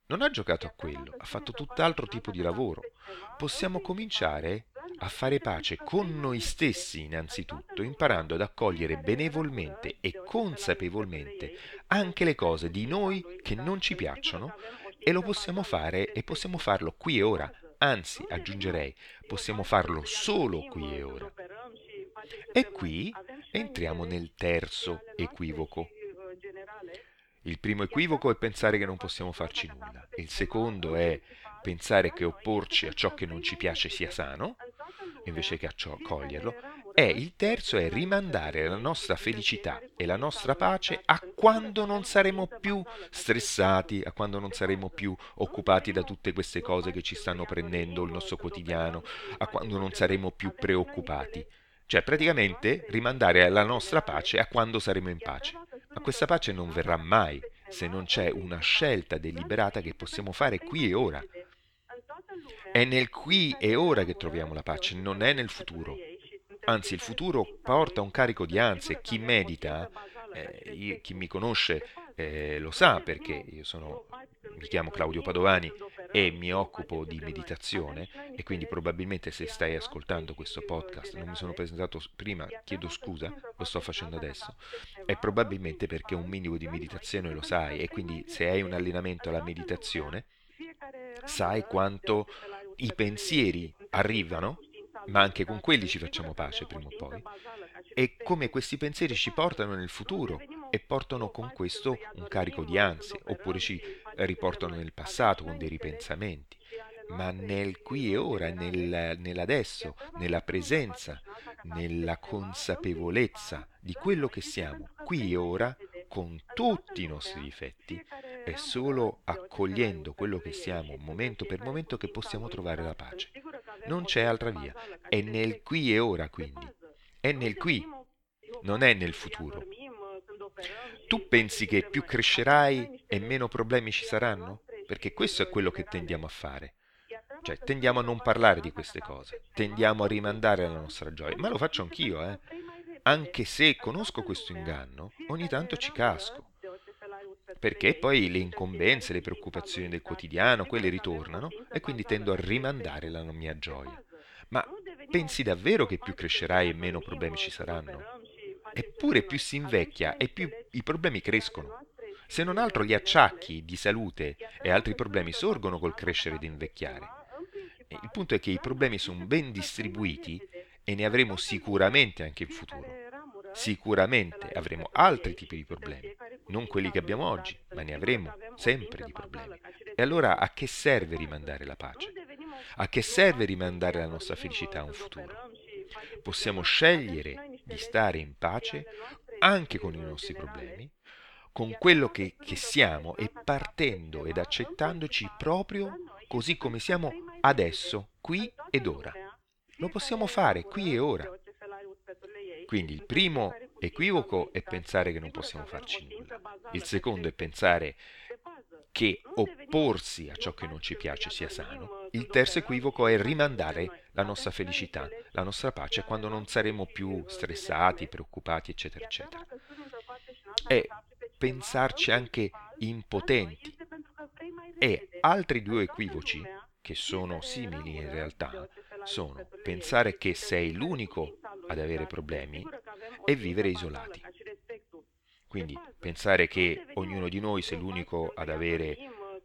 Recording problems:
voice in the background; noticeable; throughout; 15 dB below the speech

